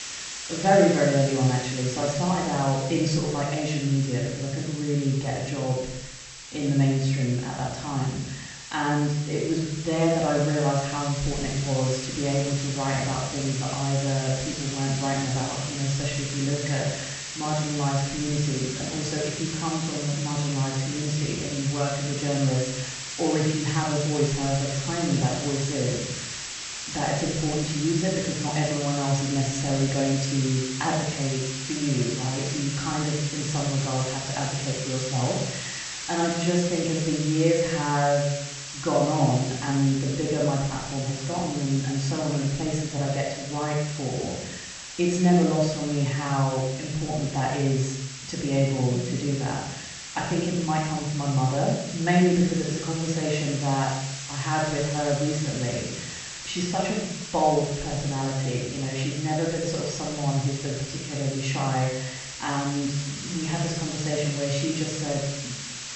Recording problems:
off-mic speech; far
echo of what is said; noticeable; throughout; 100 ms later, 15 dB below the speech
room echo; noticeable; dies away in 0.7 s
high frequencies cut off; noticeable; nothing above 8 kHz
hiss; loud; throughout; 7 dB below the speech

